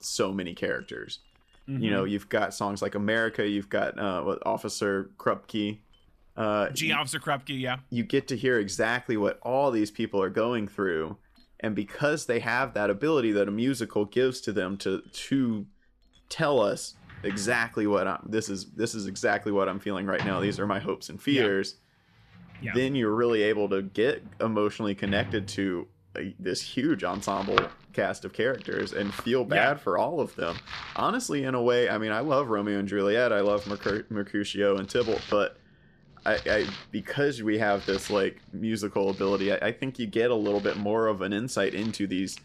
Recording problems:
household noises; noticeable; throughout; 10 dB below the speech

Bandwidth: 14 kHz